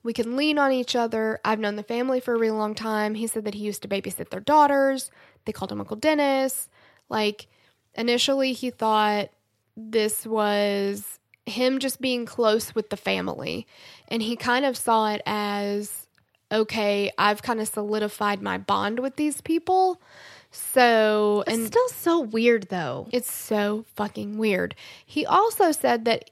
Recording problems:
none

